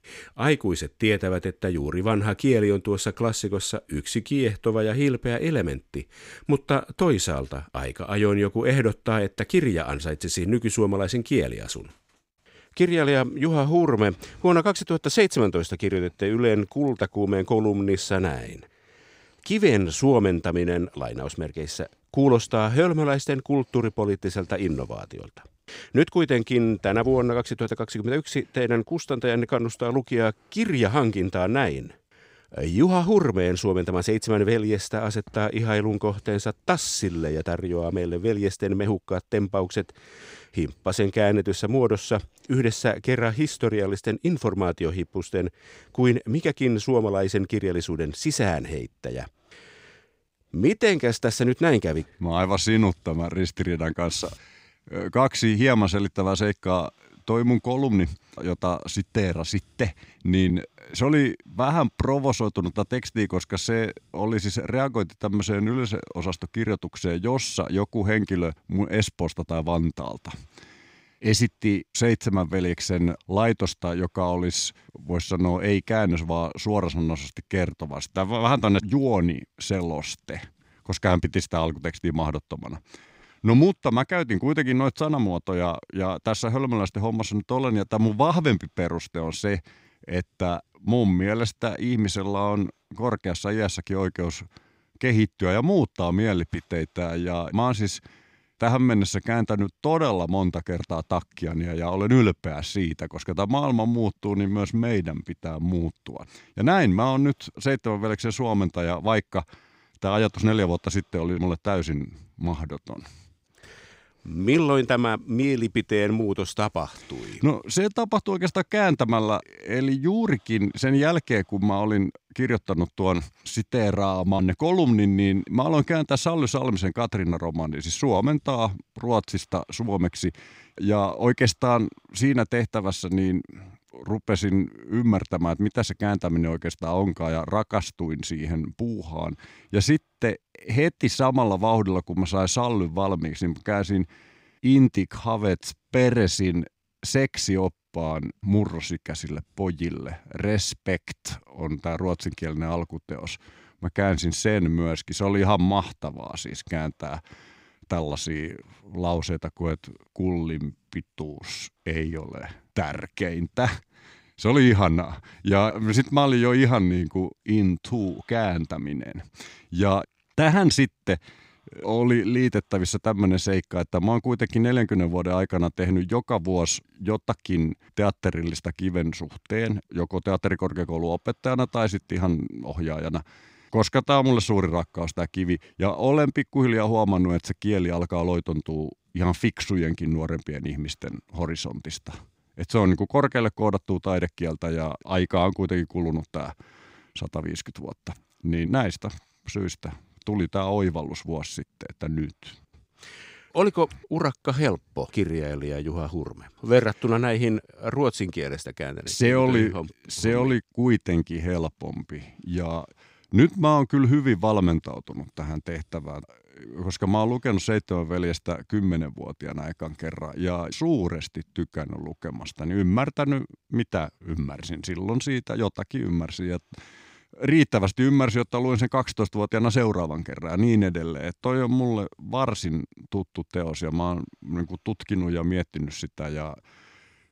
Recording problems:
none

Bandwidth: 15.5 kHz